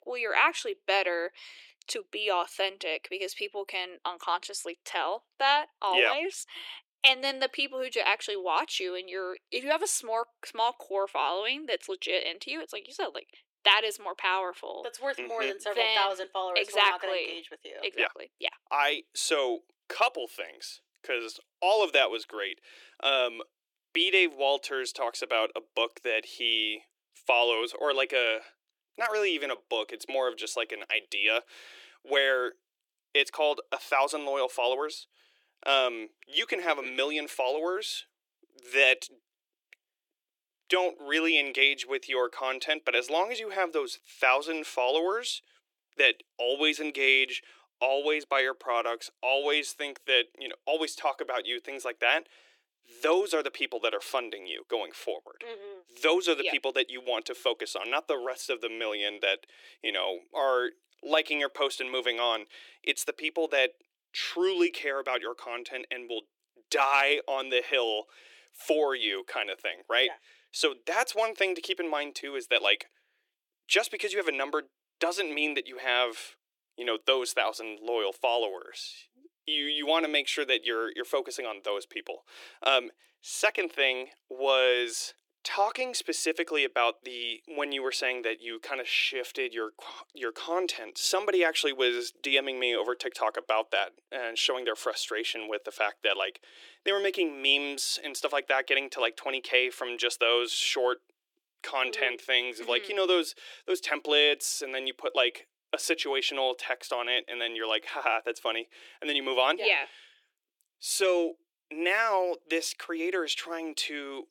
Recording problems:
thin; very; fading below 350 Hz

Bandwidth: 17 kHz